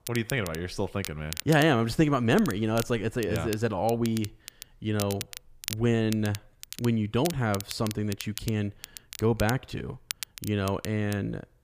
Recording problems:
crackle, like an old record; noticeable; 10 dB below the speech

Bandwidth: 15 kHz